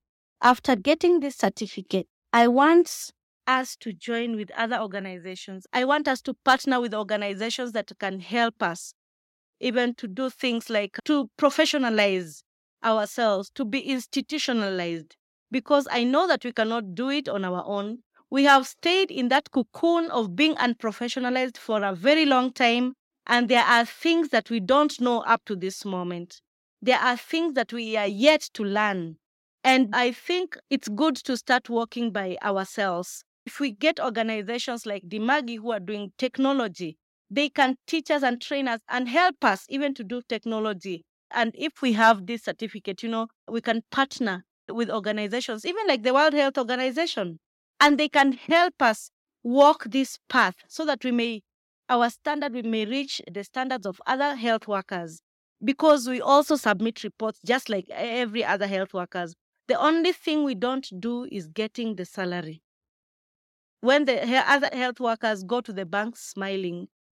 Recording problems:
none

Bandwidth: 16.5 kHz